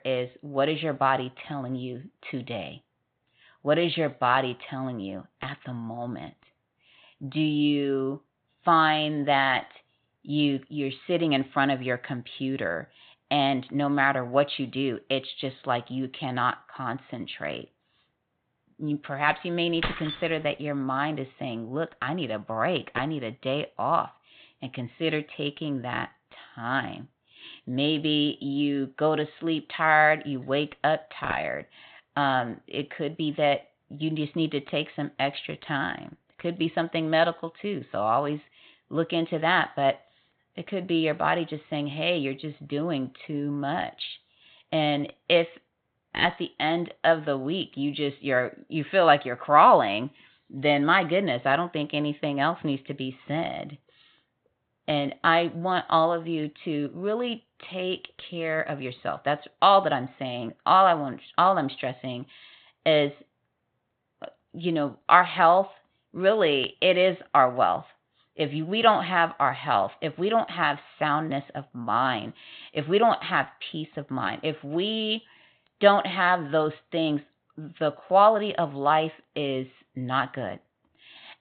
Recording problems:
high frequencies cut off; severe; nothing above 4 kHz
jangling keys; noticeable; at 20 s; peak 6 dB below the speech

